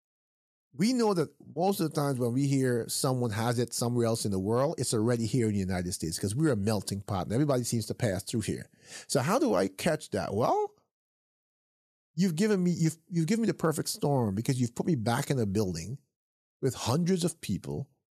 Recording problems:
none

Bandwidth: 14 kHz